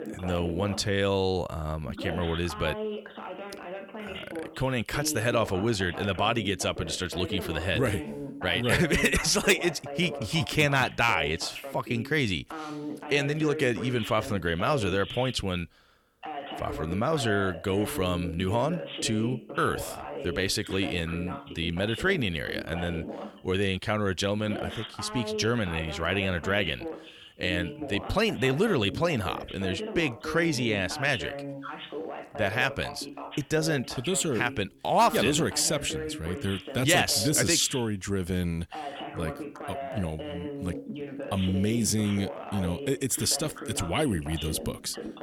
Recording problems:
voice in the background; noticeable; throughout; 10 dB below the speech

